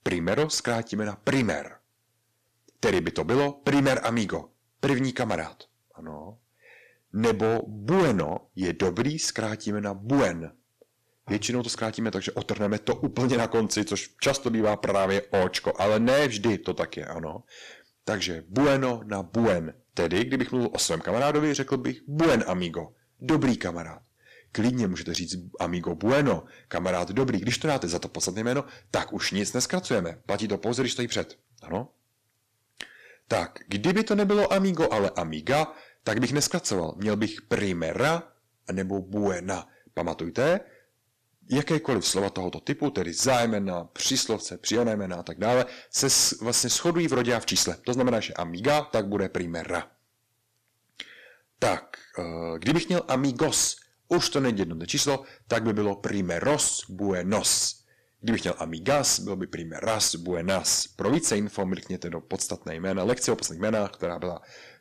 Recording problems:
distortion; heavy; 7% of the sound clipped

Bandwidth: 14.5 kHz